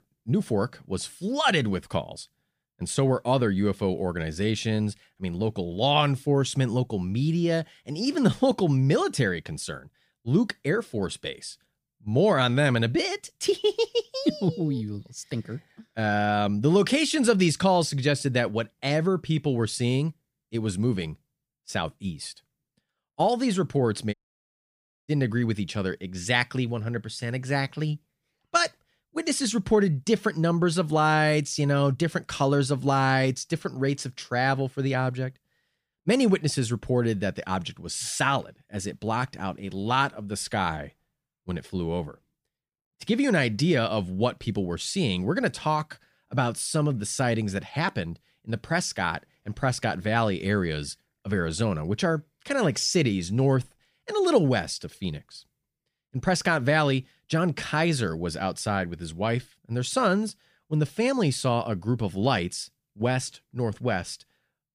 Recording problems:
audio cutting out; at 24 s for 1 s

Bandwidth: 15 kHz